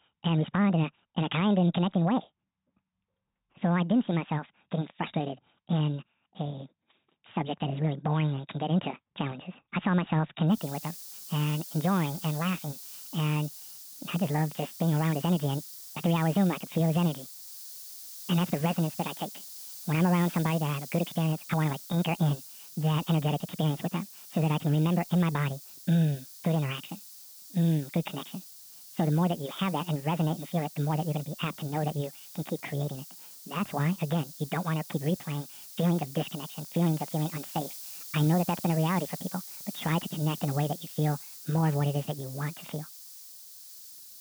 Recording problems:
high frequencies cut off; severe; nothing above 4 kHz
wrong speed and pitch; too fast and too high; 1.6 times normal speed
hiss; noticeable; from 11 s on; 15 dB below the speech

